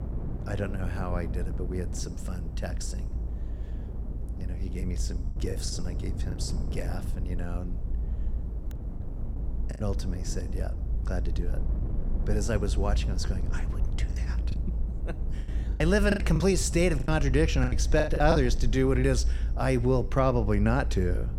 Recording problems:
wind noise on the microphone; occasional gusts; 20 dB below the speech
low rumble; faint; throughout; 20 dB below the speech
choppy; very; at 5.5 s, at 9 s and from 15 to 18 s; 14% of the speech affected

